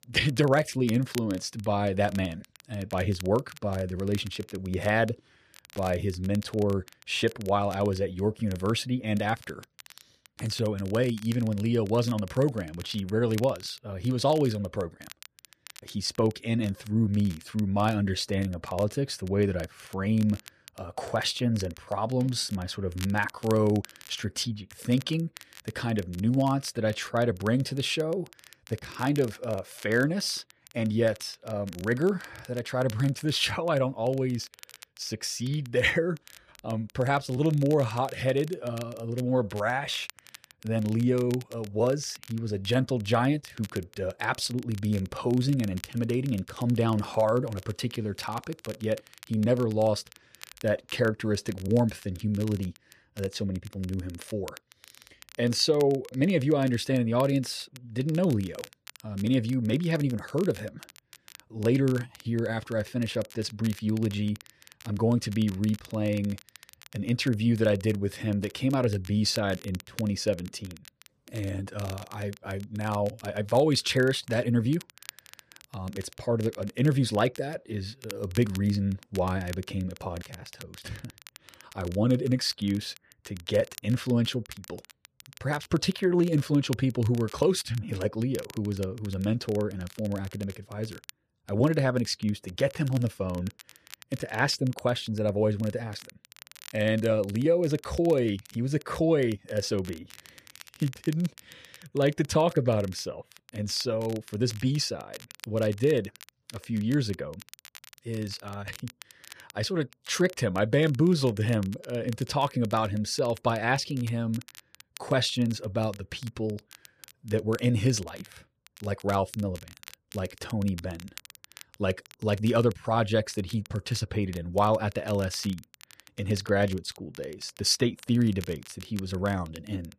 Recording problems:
crackle, like an old record; faint; 20 dB below the speech

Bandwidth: 14.5 kHz